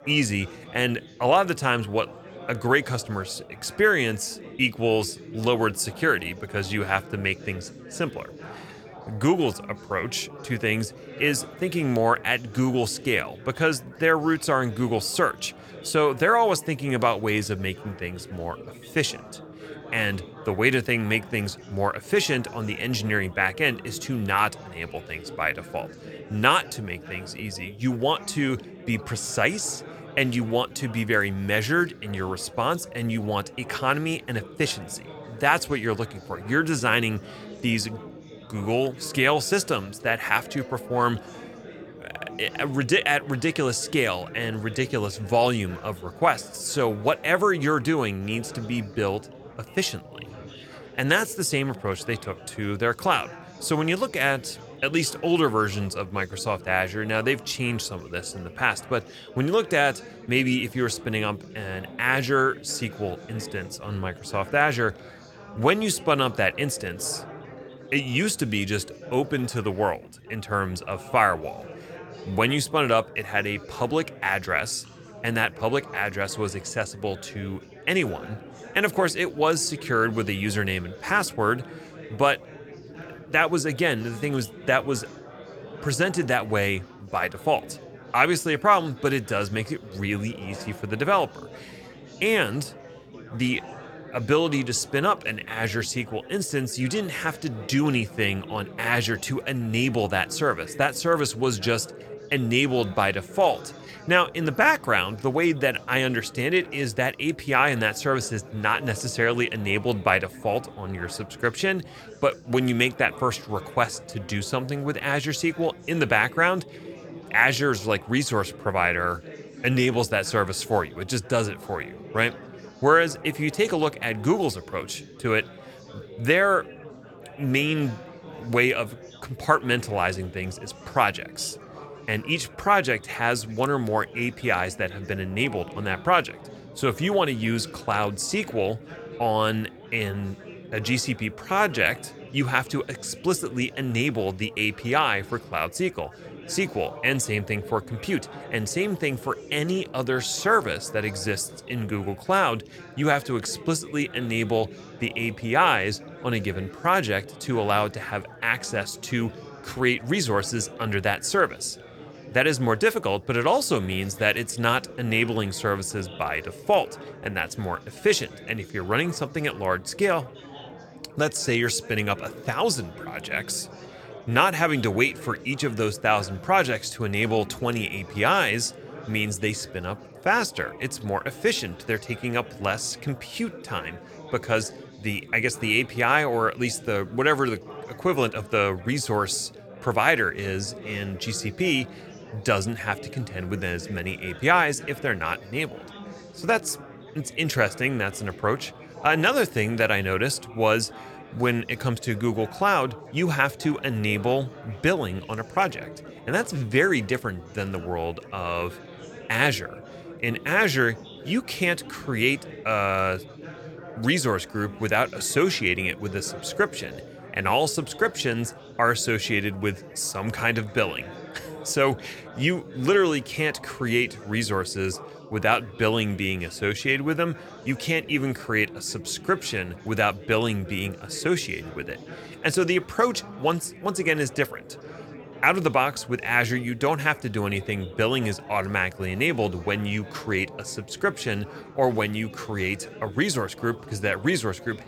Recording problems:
chatter from many people; noticeable; throughout; 15 dB below the speech

